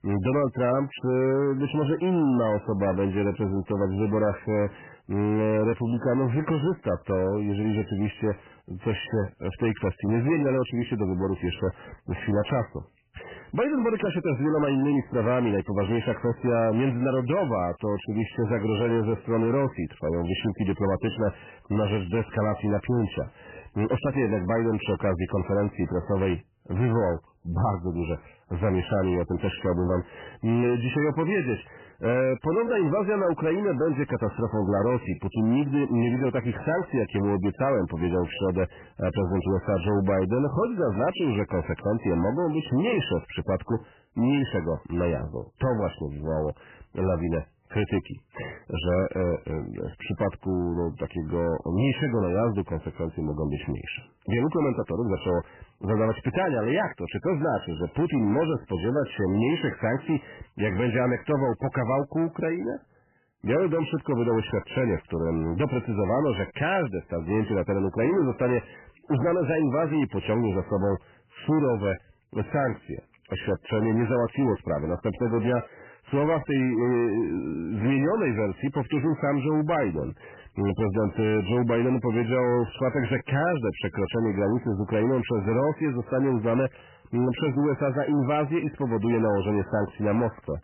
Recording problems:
garbled, watery; badly; nothing above 3 kHz
distortion; slight; 10 dB below the speech

